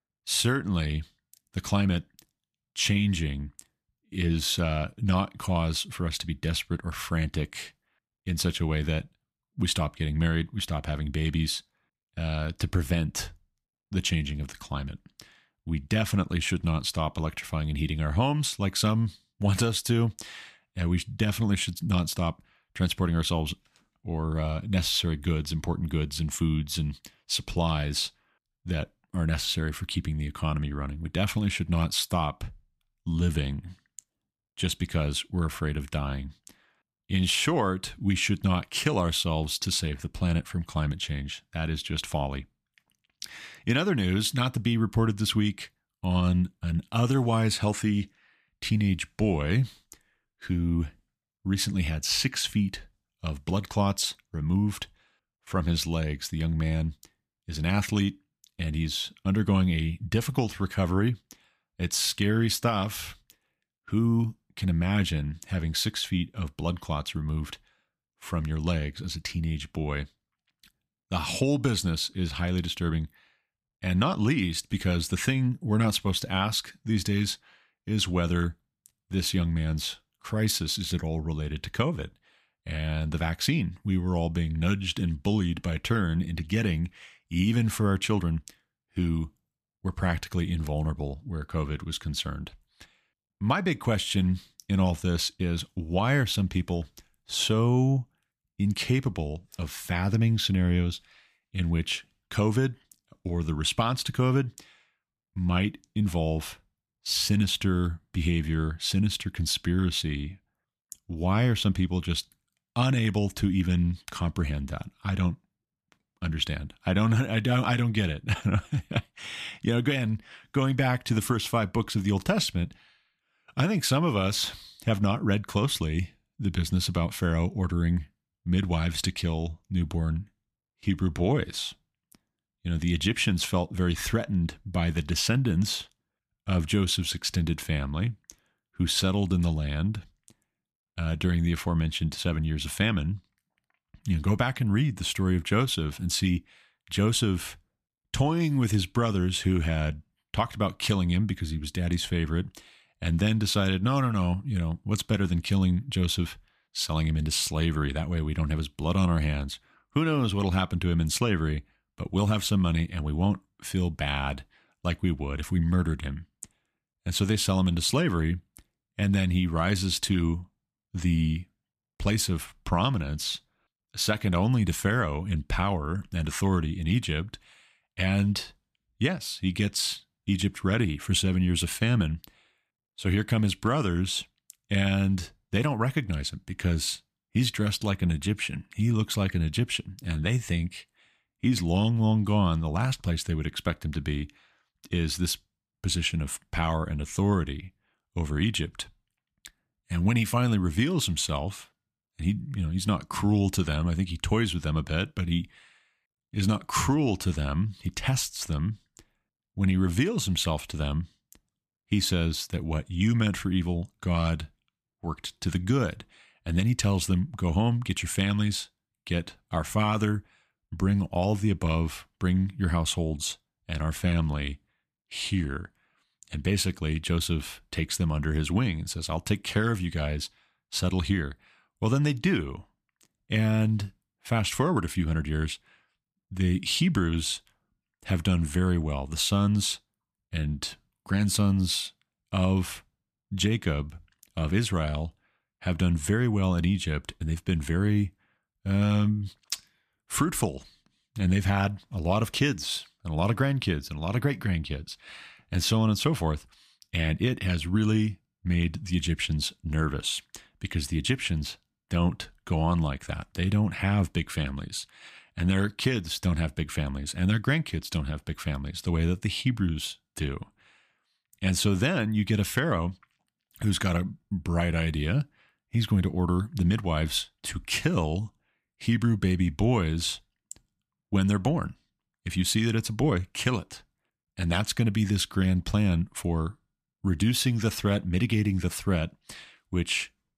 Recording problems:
none

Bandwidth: 14.5 kHz